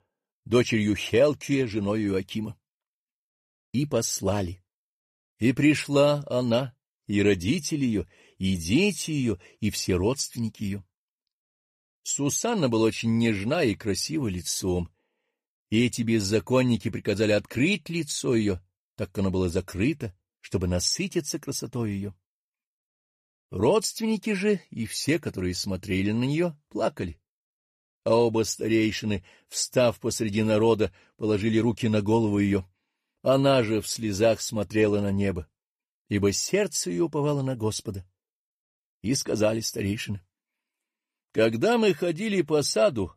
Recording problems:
none

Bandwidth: 14.5 kHz